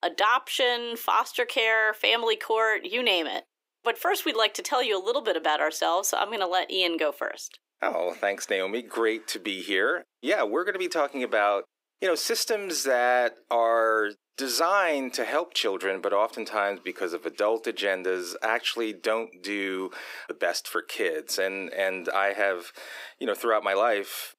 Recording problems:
thin; somewhat; fading below 300 Hz

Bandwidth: 15.5 kHz